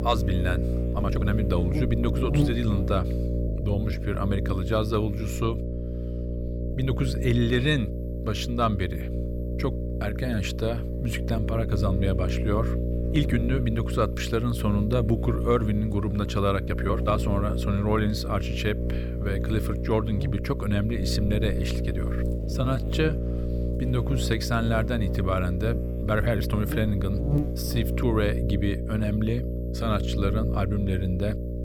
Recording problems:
electrical hum; loud; throughout; 60 Hz, 6 dB below the speech
uneven, jittery; strongly; from 1 to 27 s

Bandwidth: 18 kHz